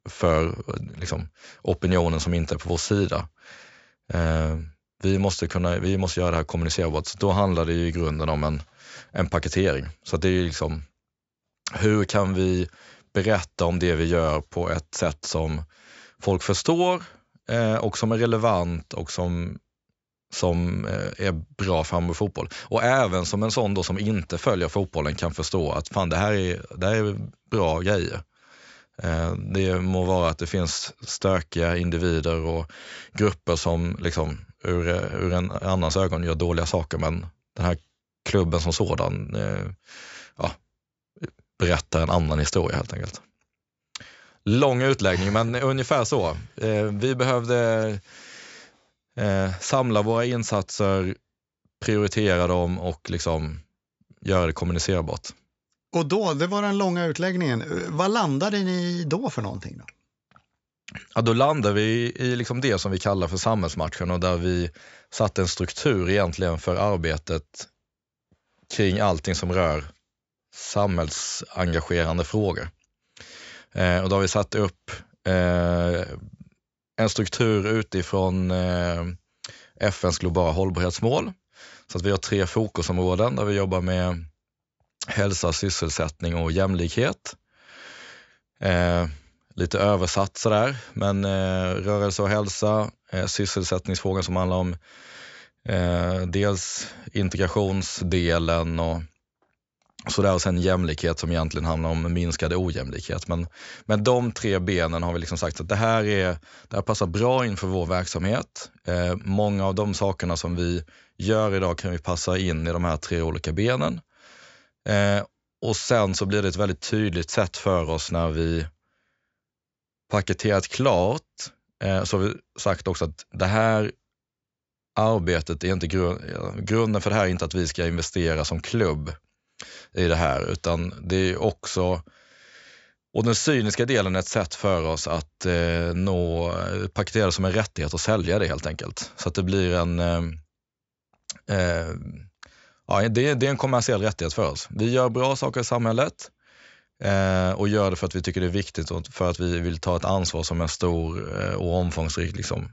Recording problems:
high frequencies cut off; noticeable; nothing above 8 kHz

